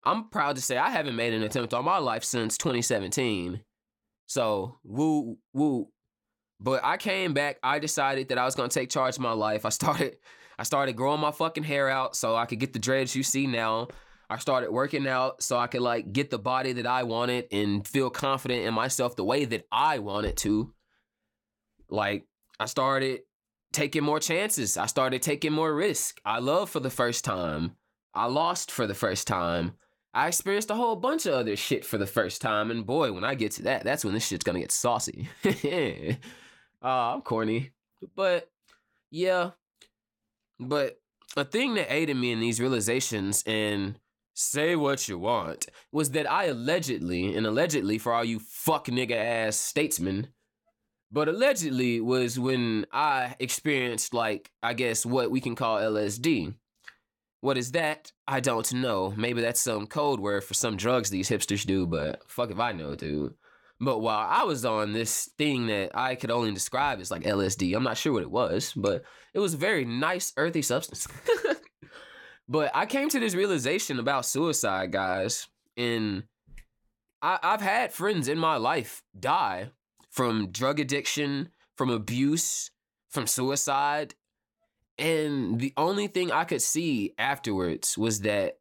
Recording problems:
none

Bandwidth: 17.5 kHz